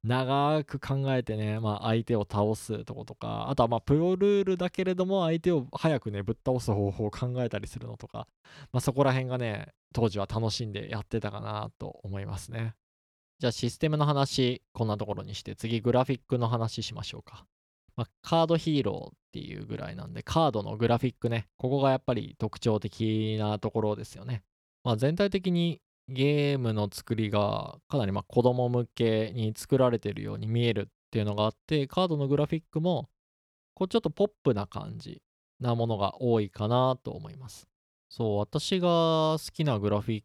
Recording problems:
none

